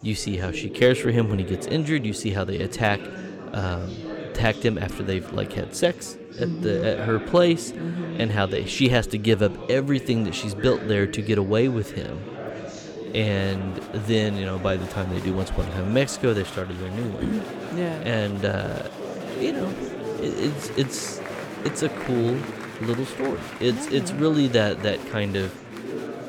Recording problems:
chatter from many people; noticeable; throughout; 10 dB below the speech

